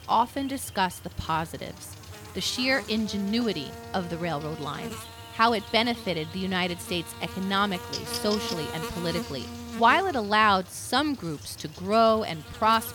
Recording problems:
electrical hum; noticeable; throughout; 50 Hz, 15 dB below the speech

